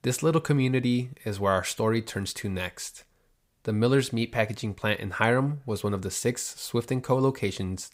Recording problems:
none

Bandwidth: 15.5 kHz